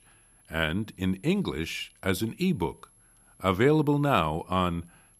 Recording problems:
high-pitched whine; faint; throughout; 11 kHz, 30 dB below the speech

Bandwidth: 14.5 kHz